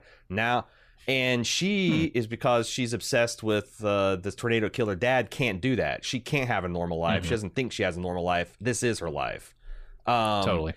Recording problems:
none

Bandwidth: 14.5 kHz